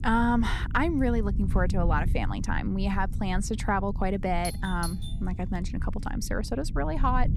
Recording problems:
low rumble; noticeable; throughout; 15 dB below the speech
doorbell; noticeable; at 4.5 s; peak 9 dB below the speech

